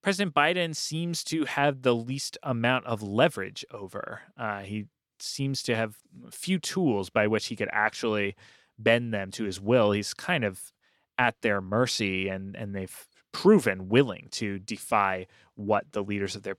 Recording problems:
none

